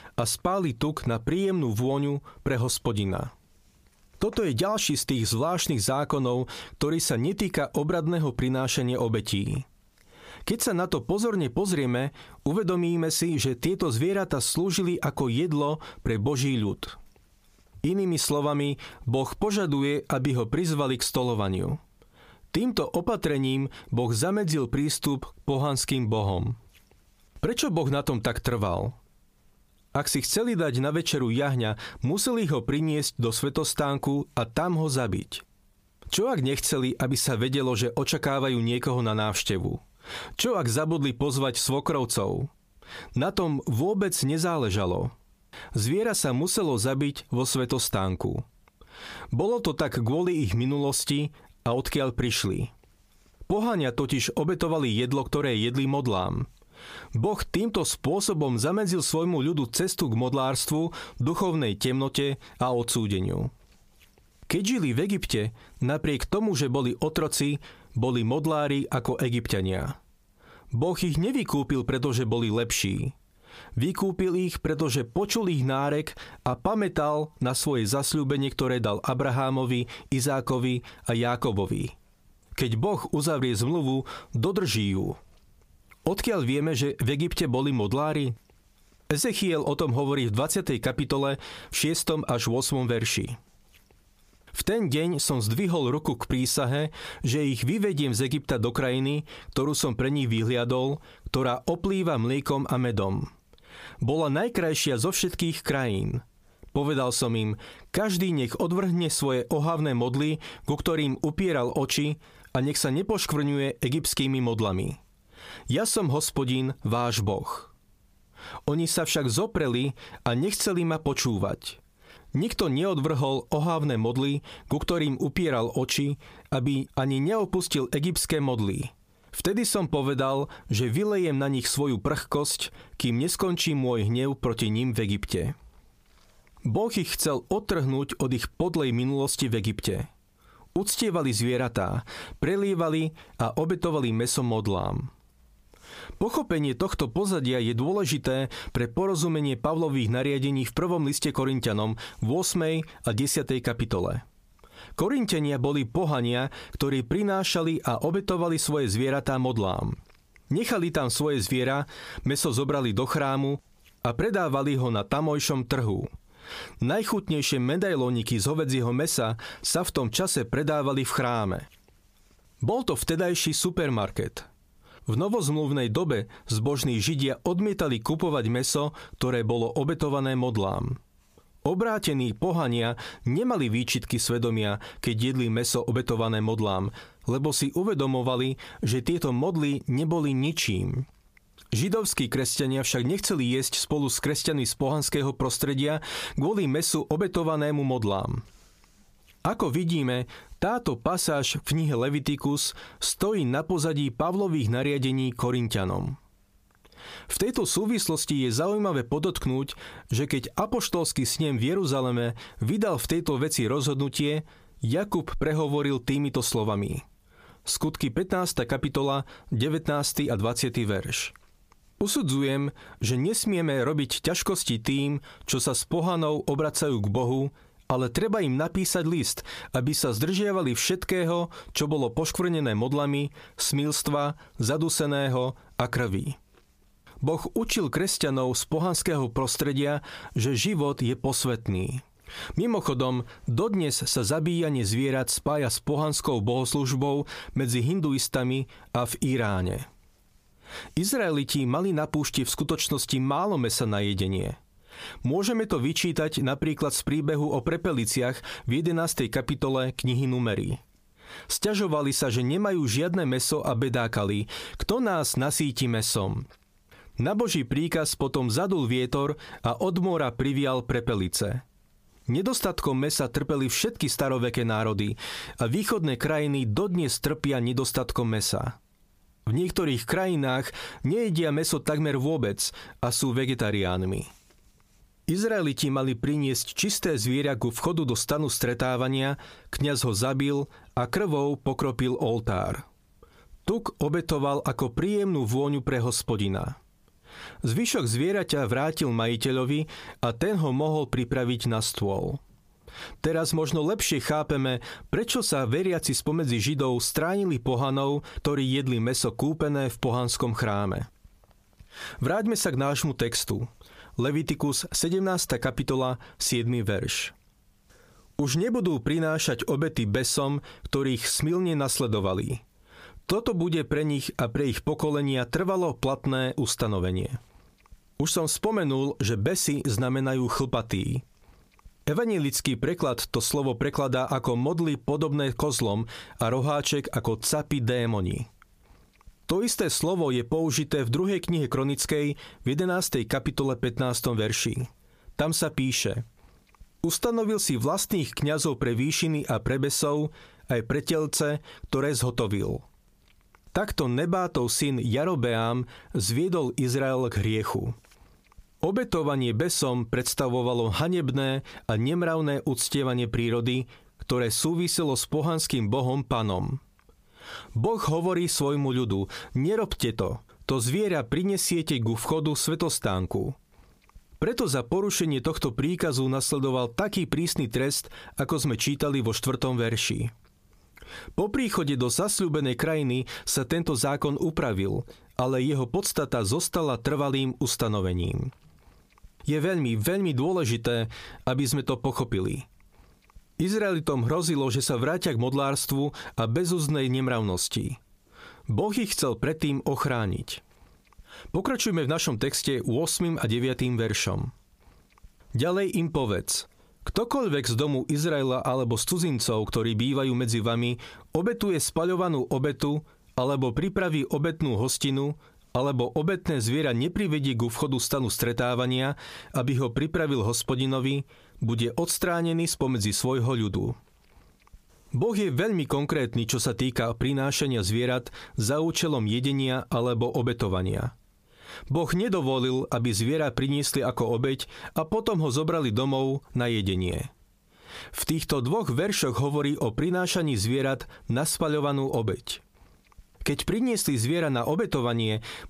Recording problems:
squashed, flat; heavily

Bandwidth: 15 kHz